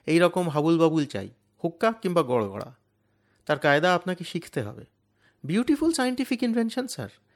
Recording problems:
none

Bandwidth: 18 kHz